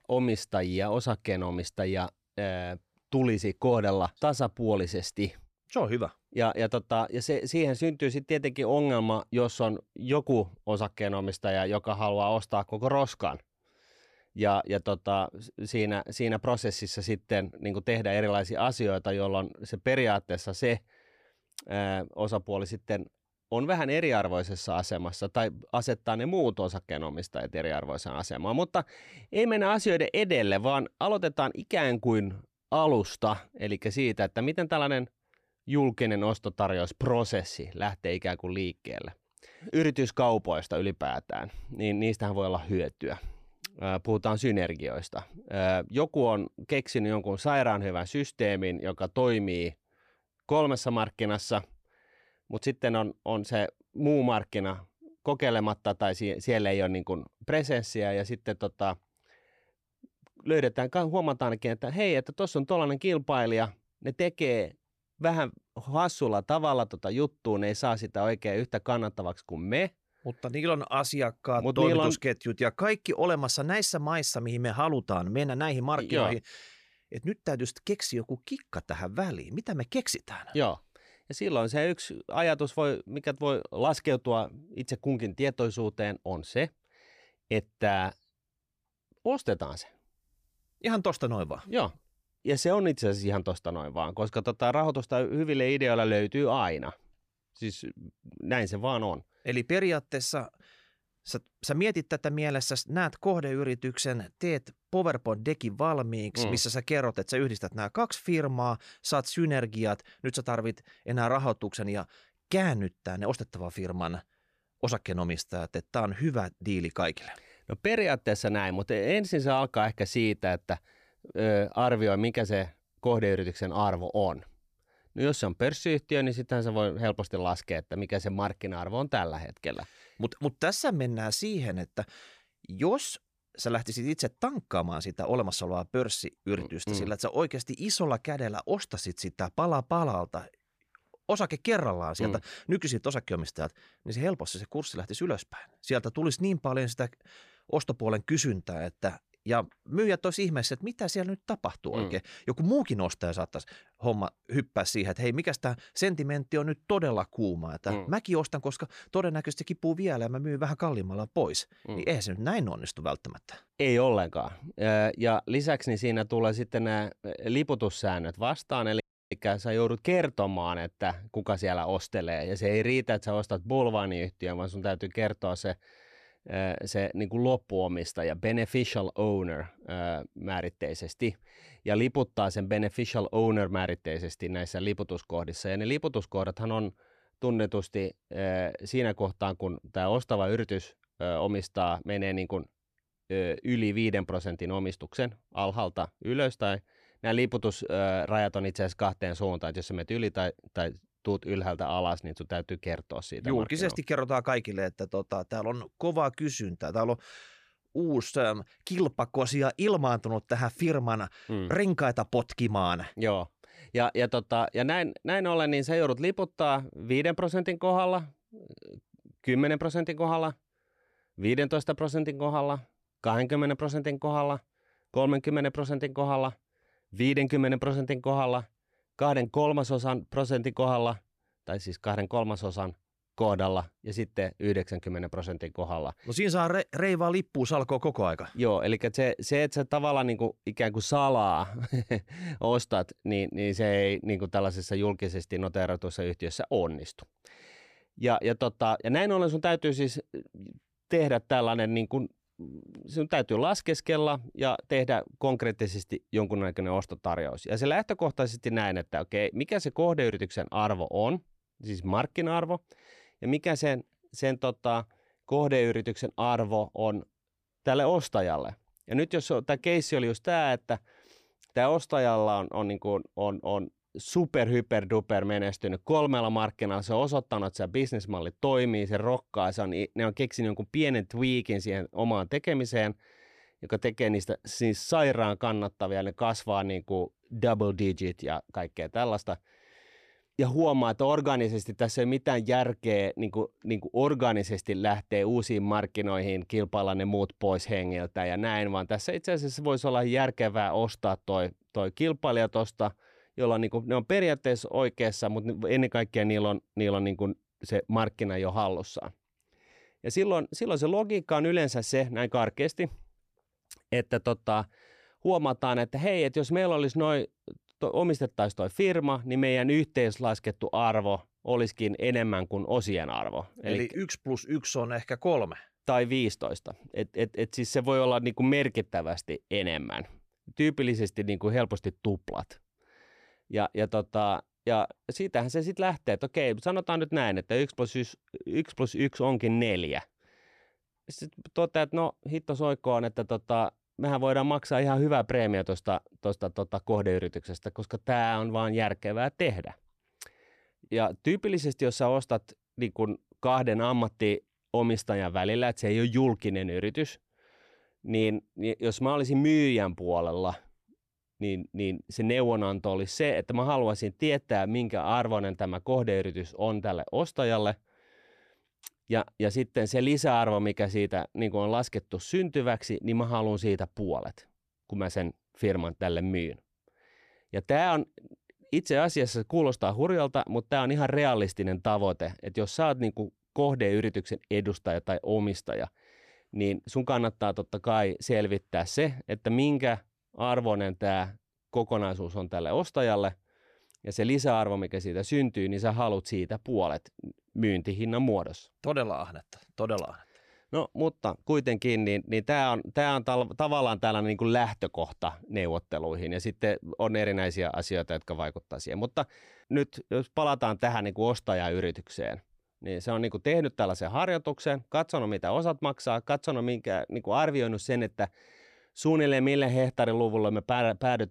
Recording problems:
audio cutting out; at 2:49

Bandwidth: 15 kHz